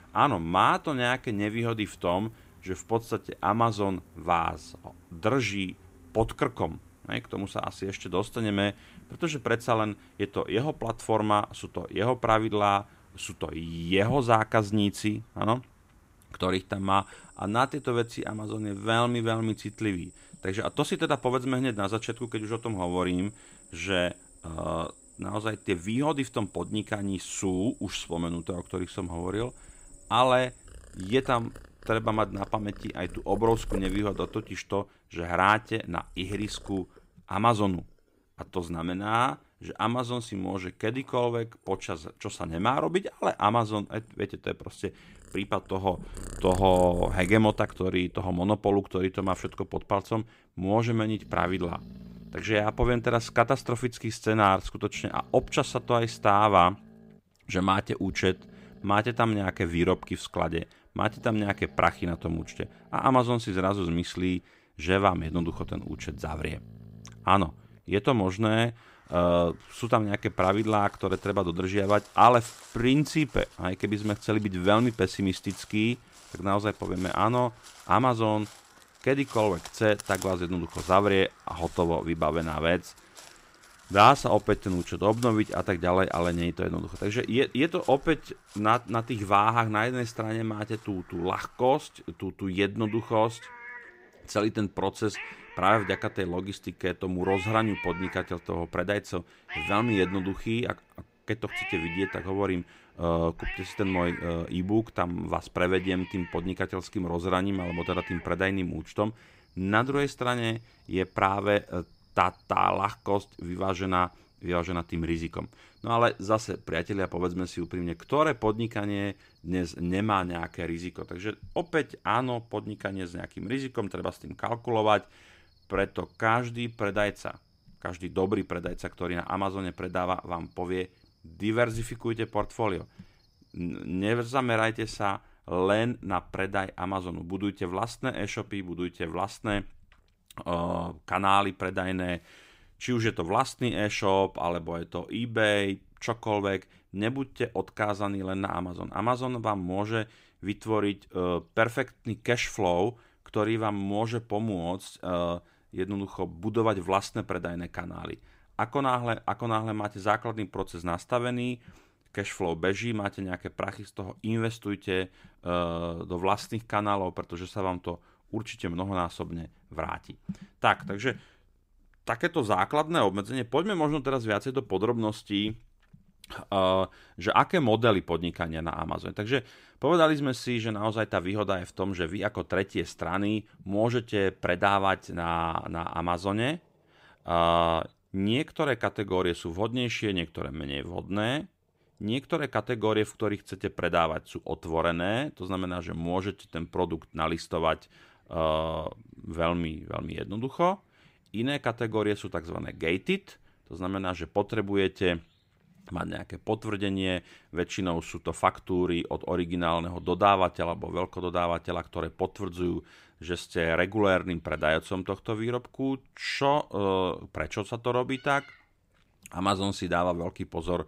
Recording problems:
animal sounds; noticeable; throughout; 15 dB below the speech

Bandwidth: 15.5 kHz